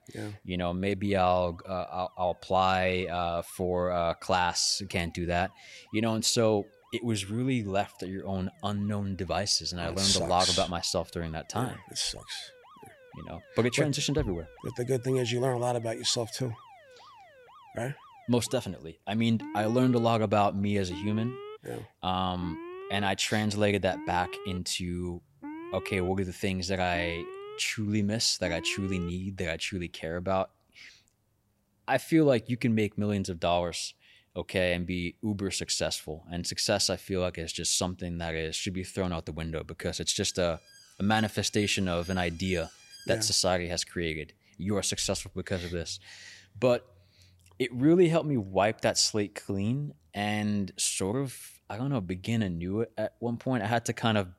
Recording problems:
alarms or sirens; noticeable; until 43 s; 20 dB below the speech

